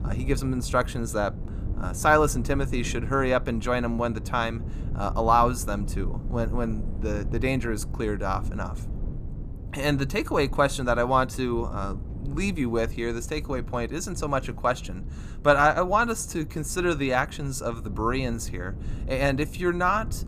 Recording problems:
low rumble; faint; throughout; 20 dB below the speech

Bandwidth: 14.5 kHz